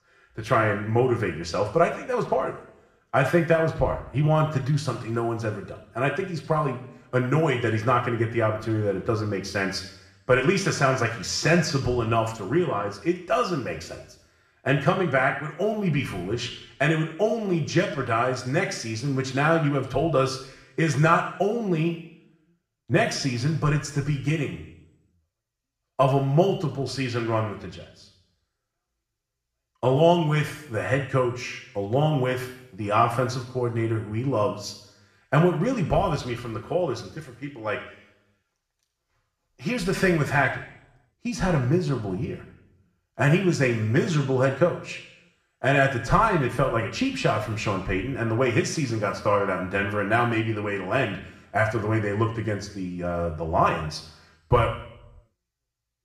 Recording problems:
room echo; slight; dies away in 0.7 s
off-mic speech; somewhat distant

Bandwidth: 14.5 kHz